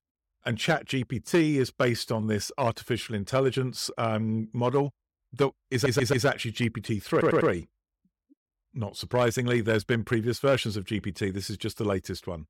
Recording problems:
audio stuttering; at 5.5 s and at 7 s

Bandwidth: 16.5 kHz